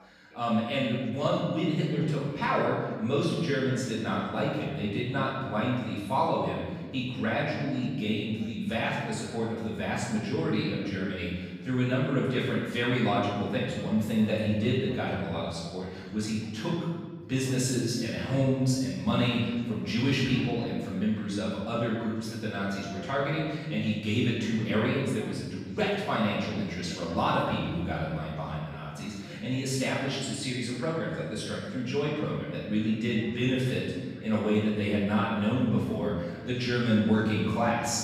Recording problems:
room echo; strong; dies away in 1.3 s
off-mic speech; far
background chatter; faint; throughout; 3 voices, 25 dB below the speech

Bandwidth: 15 kHz